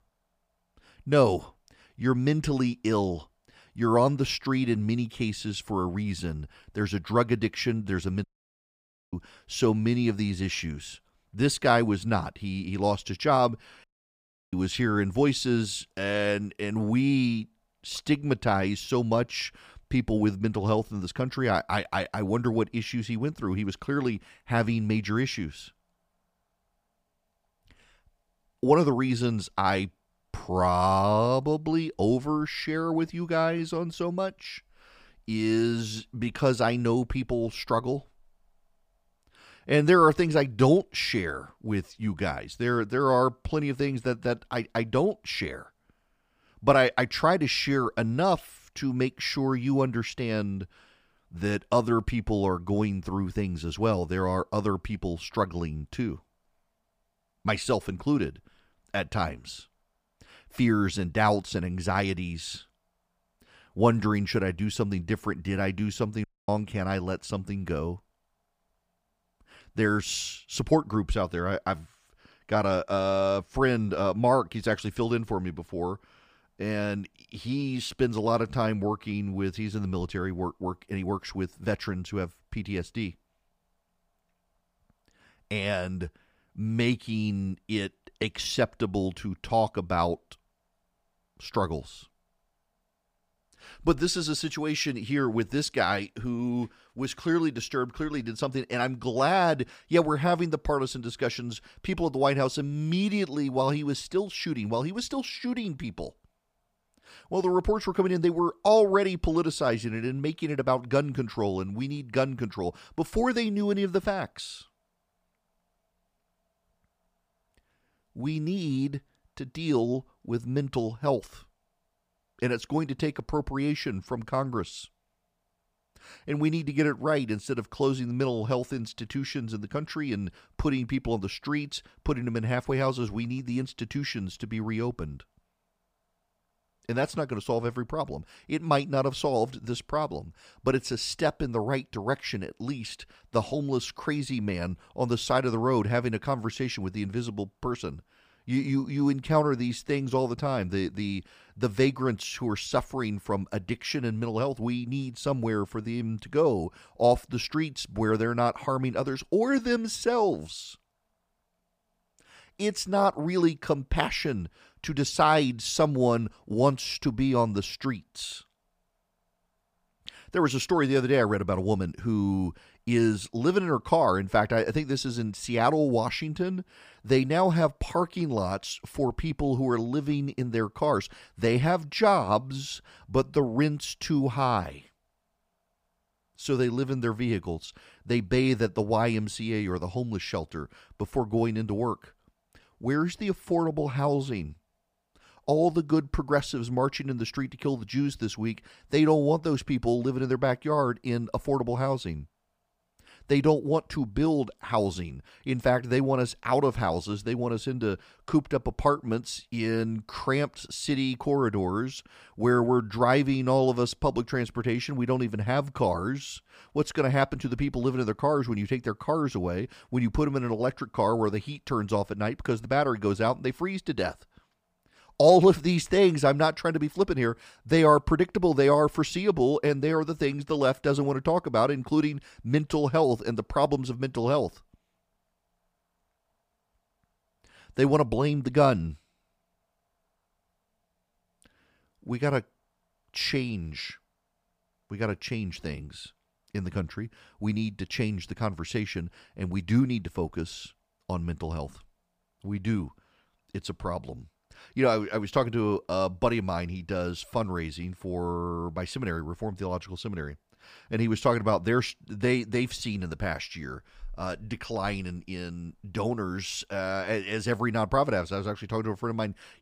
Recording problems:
audio cutting out; at 8 s for 1 s, at 14 s for 0.5 s and at 1:06

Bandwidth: 15 kHz